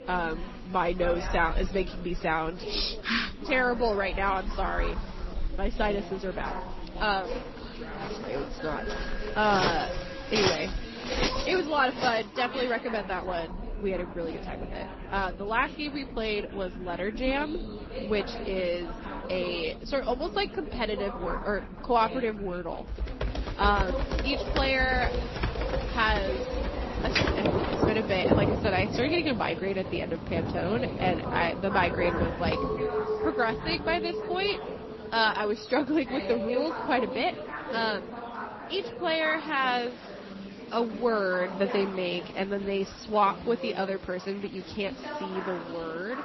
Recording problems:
garbled, watery; slightly; nothing above 5.5 kHz
rain or running water; loud; throughout; 6 dB below the speech
chatter from many people; loud; throughout; 10 dB below the speech
alarm; noticeable; from 8.5 to 11 s; peak 10 dB below the speech
keyboard typing; loud; from 23 to 28 s; peak 1 dB above the speech
clattering dishes; noticeable; from 33 to 37 s; peak level with the speech

